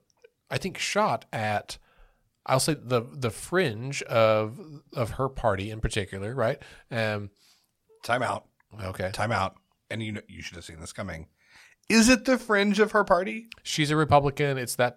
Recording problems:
none

